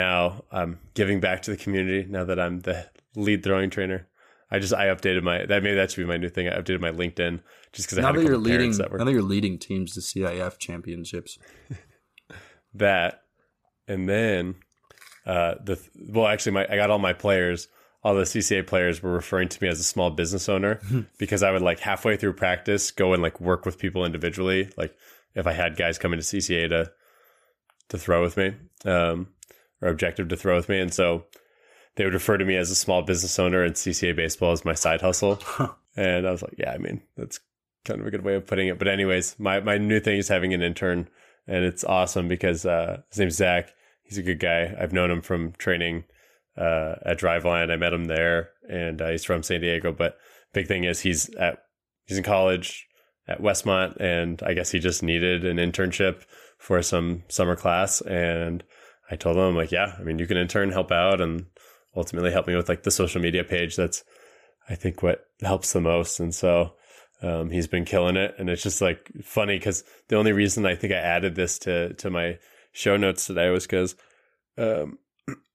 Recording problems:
abrupt cut into speech; at the start

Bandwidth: 14.5 kHz